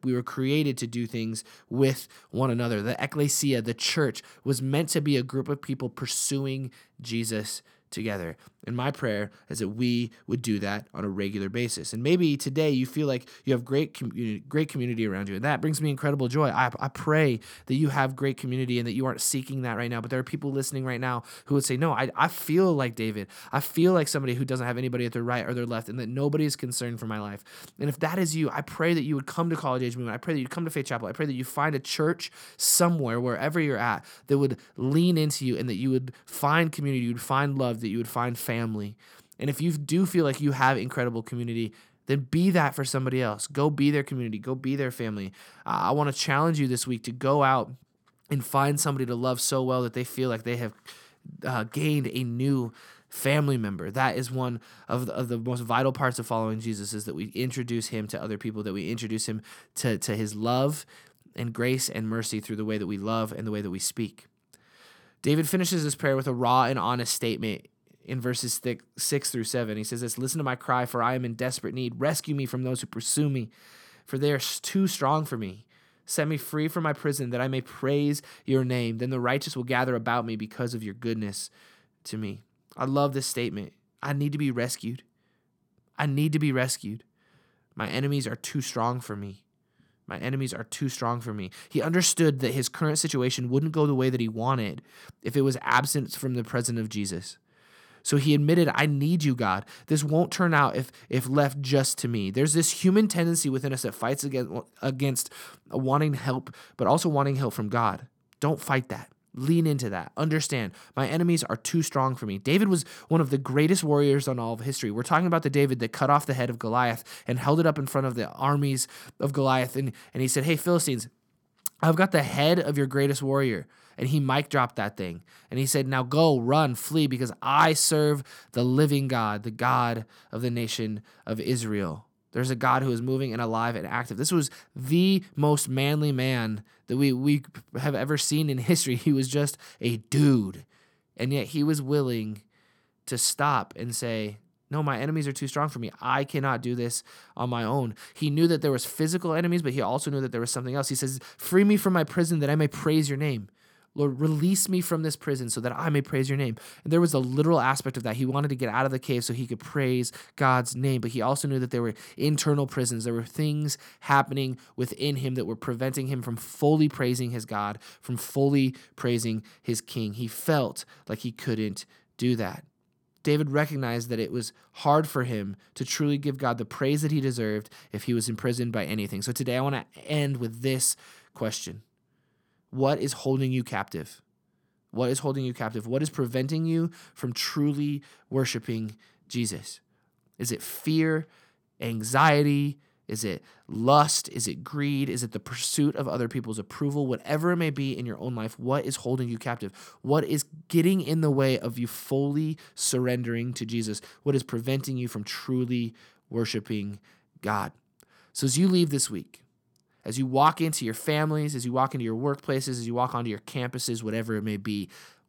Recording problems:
none

